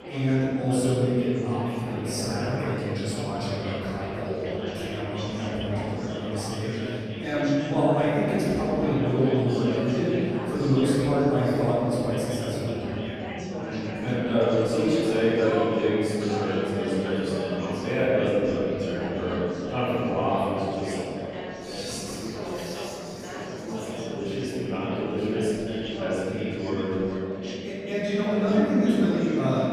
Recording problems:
room echo; strong; dies away in 3 s
off-mic speech; far
chatter from many people; loud; throughout; 8 dB below the speech

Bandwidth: 15 kHz